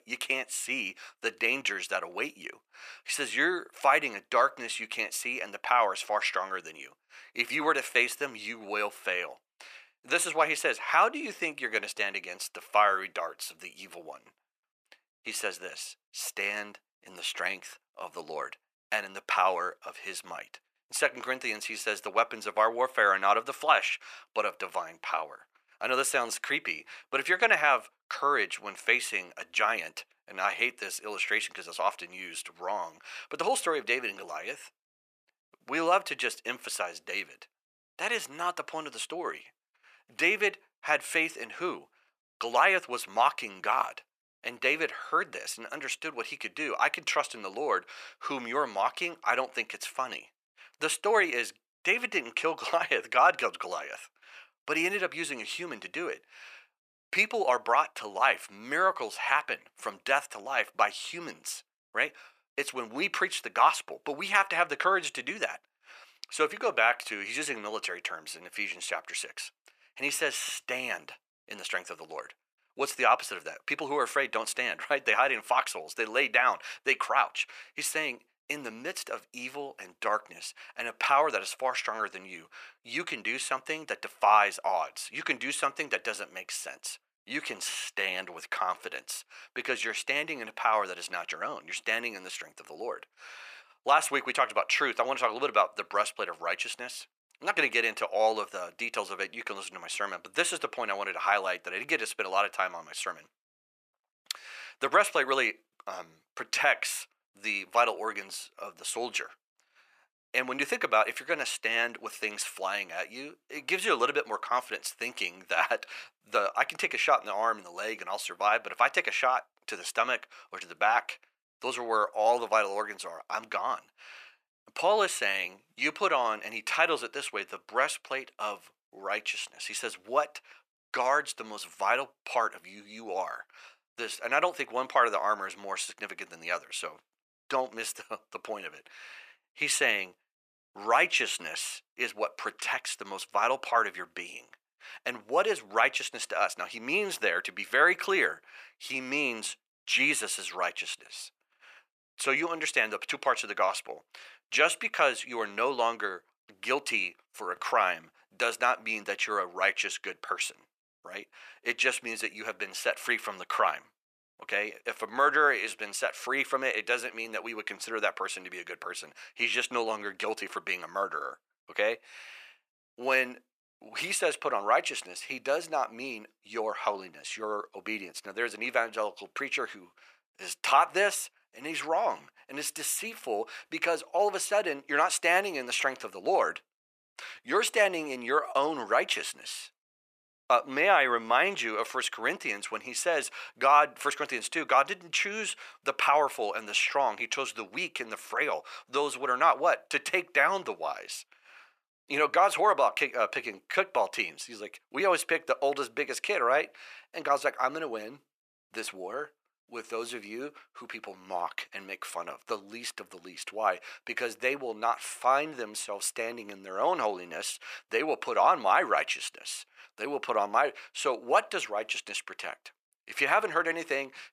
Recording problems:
thin; very; fading below 750 Hz

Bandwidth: 14.5 kHz